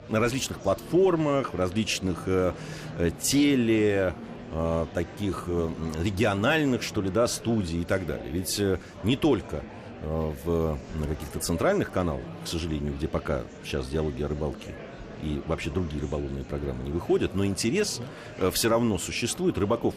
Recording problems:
murmuring crowd; noticeable; throughout; 15 dB below the speech

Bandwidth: 14.5 kHz